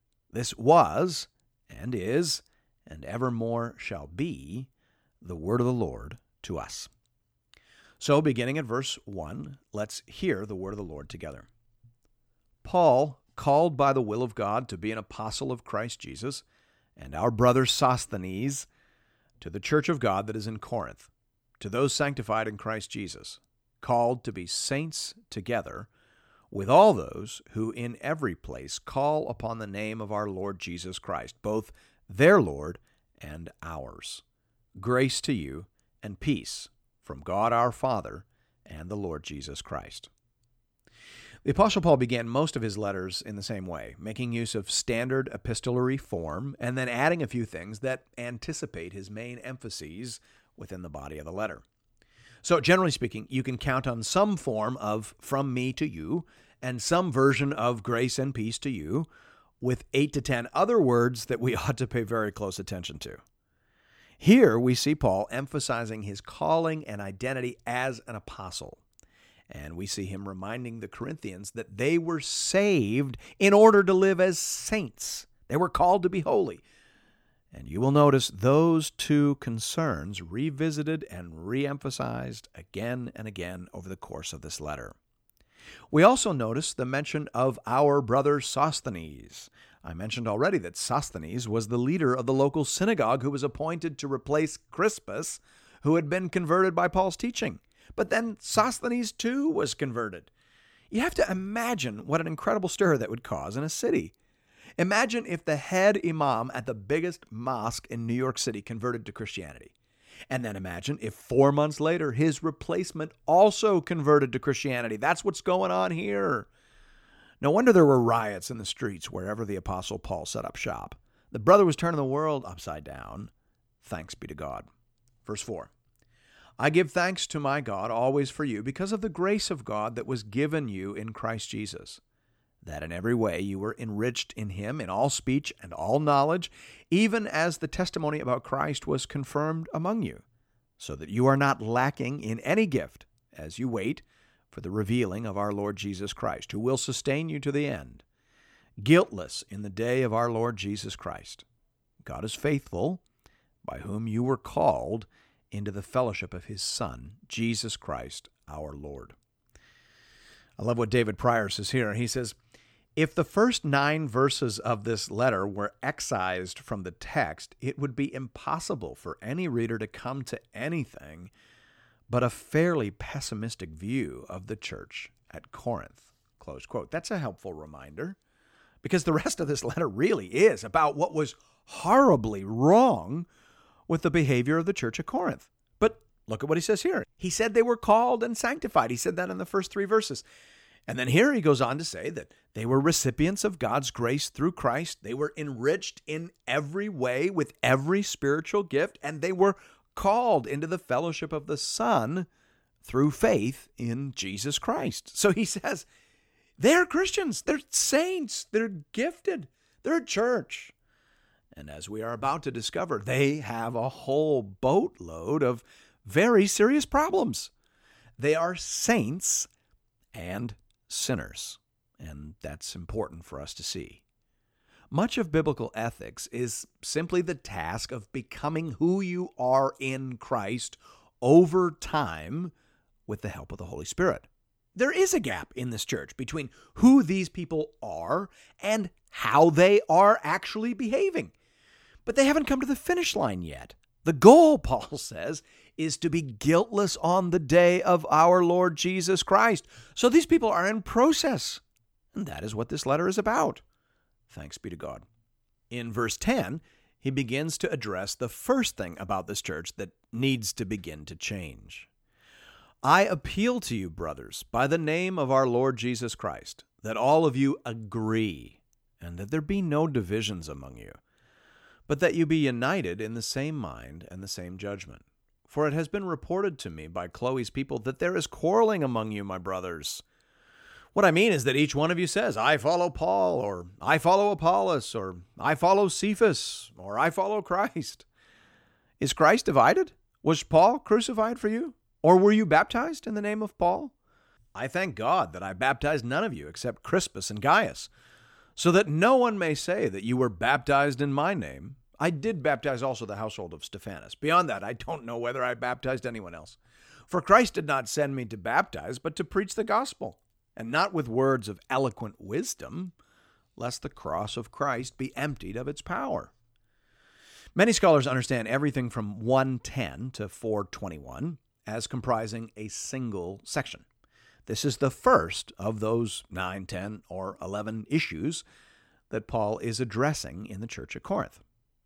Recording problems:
none

